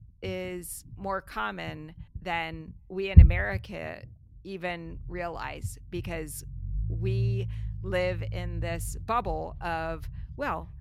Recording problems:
low rumble; loud; throughout; 9 dB below the speech

